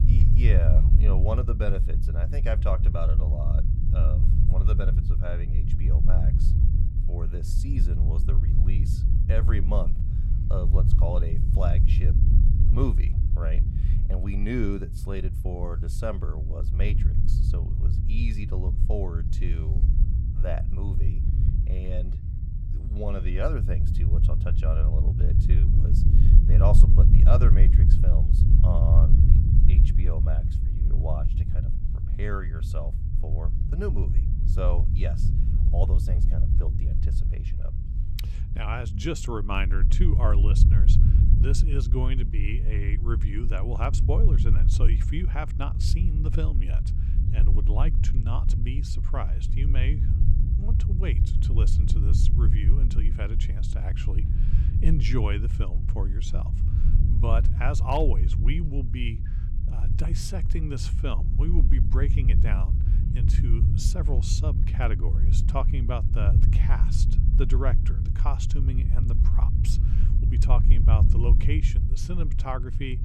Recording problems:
low rumble; loud; throughout; 4 dB below the speech

